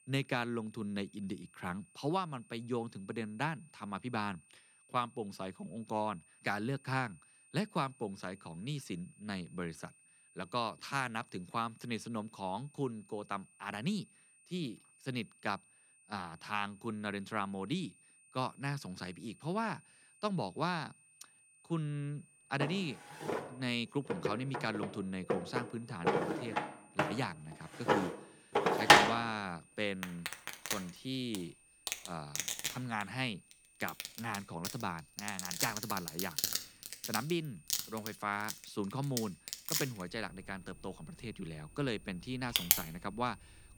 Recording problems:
household noises; very loud; from 22 s on; 5 dB above the speech
high-pitched whine; faint; throughout; 9 kHz, 25 dB below the speech

